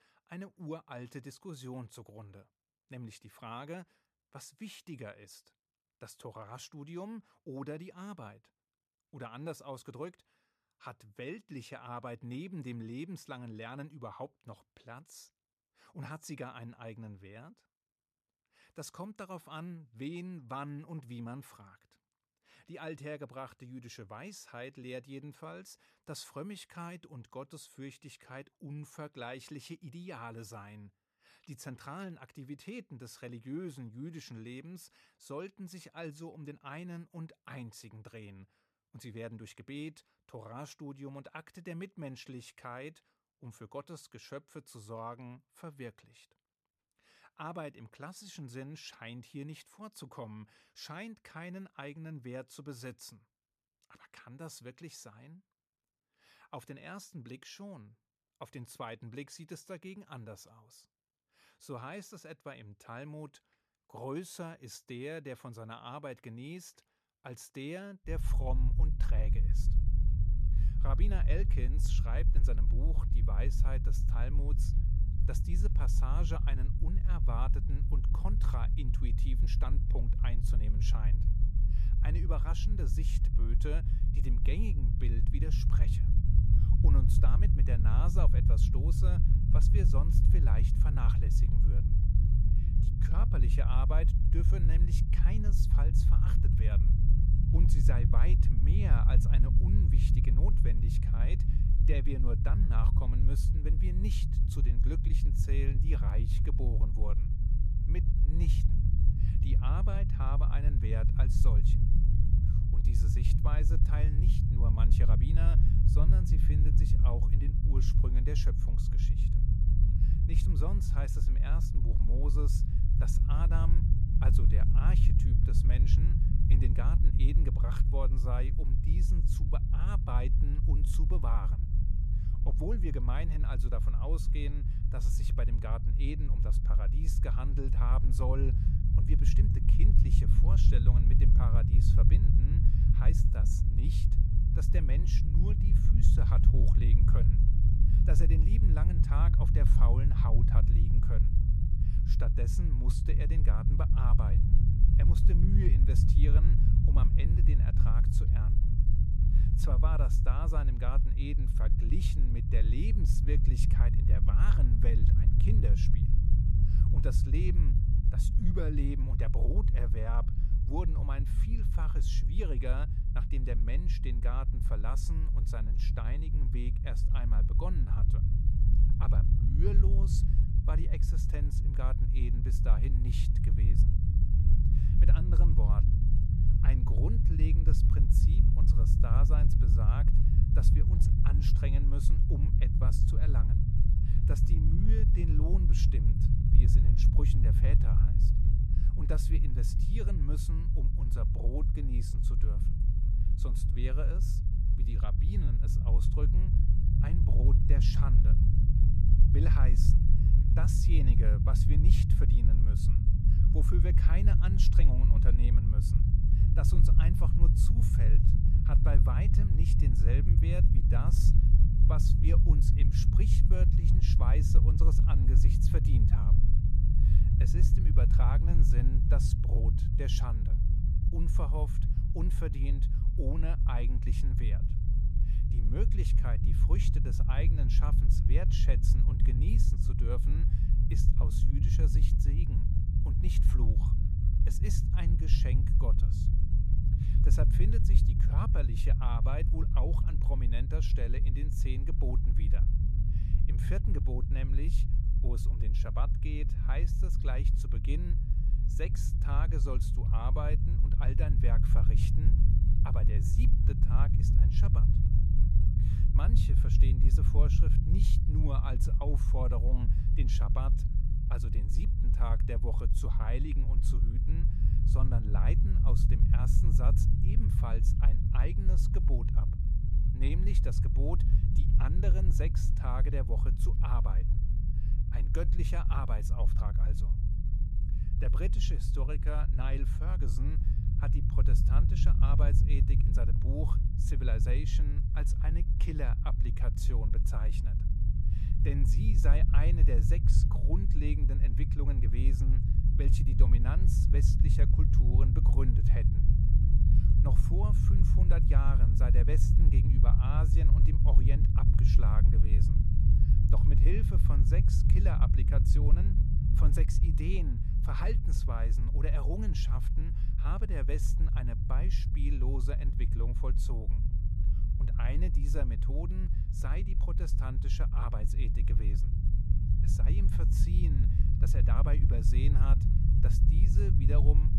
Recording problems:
low rumble; loud; from 1:08 on; 1 dB below the speech

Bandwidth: 14.5 kHz